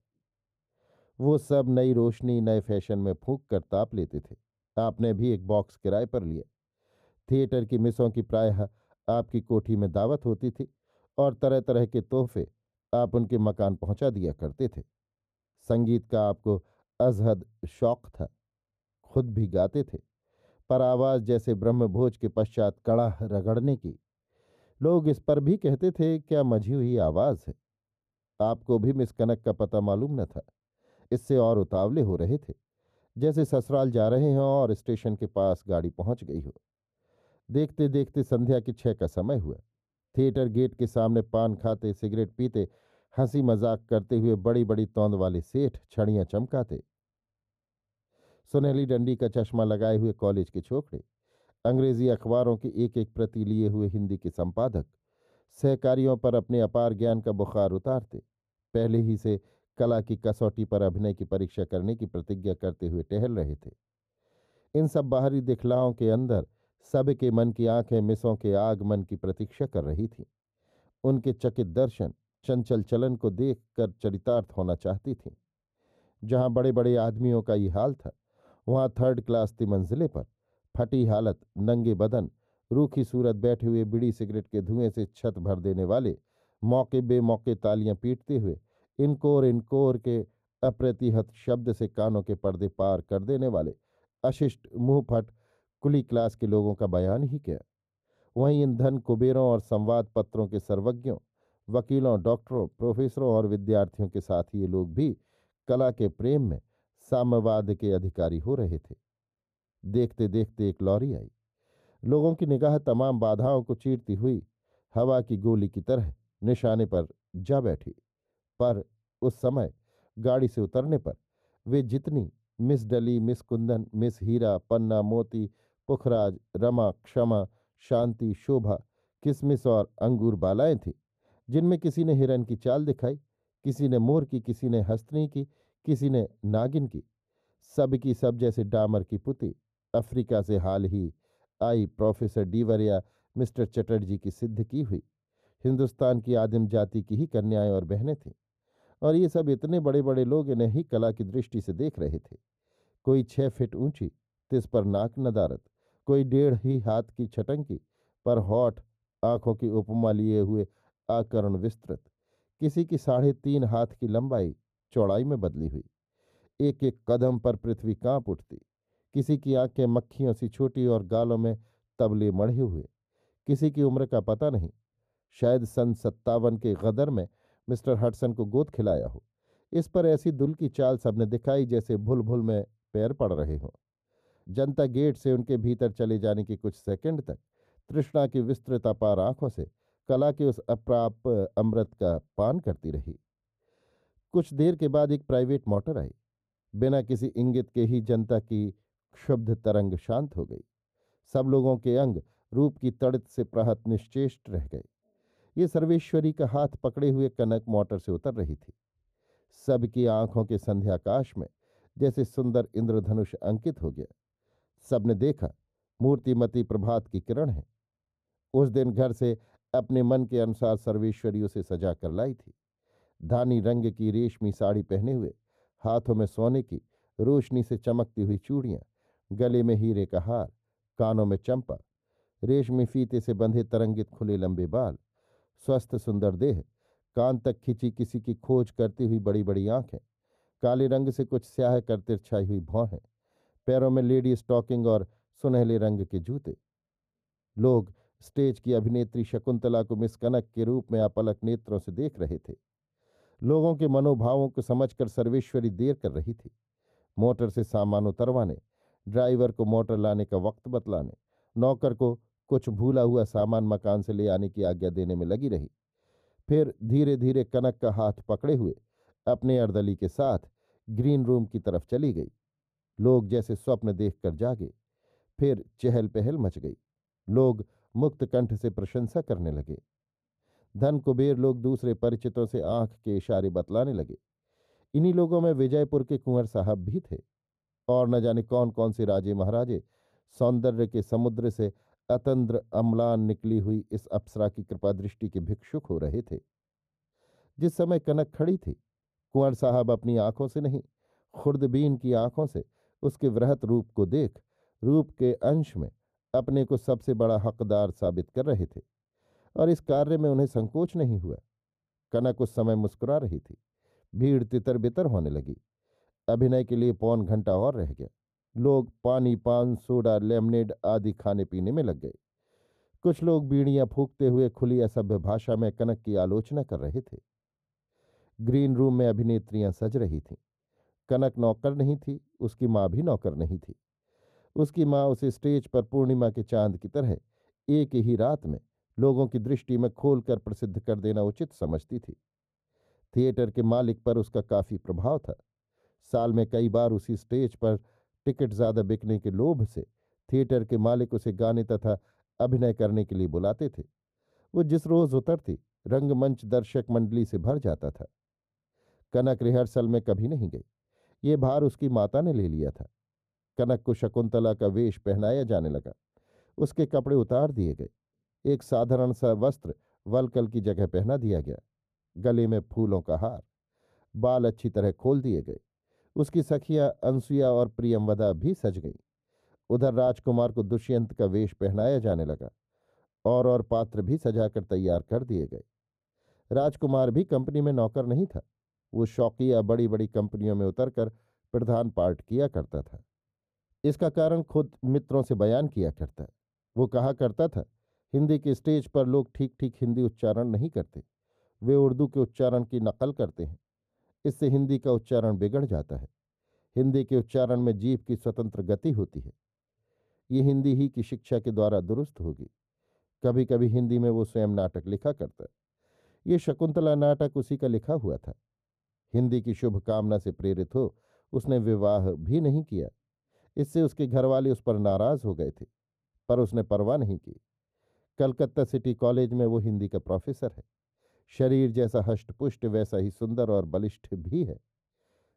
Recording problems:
muffled; very; fading above 1 kHz

